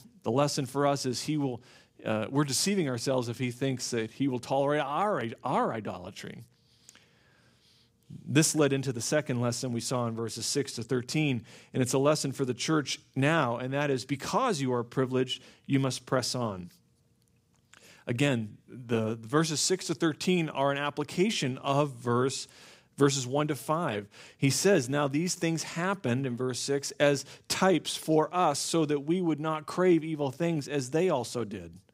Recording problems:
none

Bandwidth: 15.5 kHz